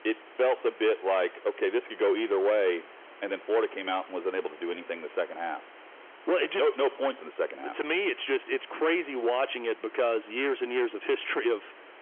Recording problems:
phone-call audio; nothing above 3.5 kHz
distortion; slight; 7% of the sound clipped
hiss; faint; throughout; 20 dB below the speech

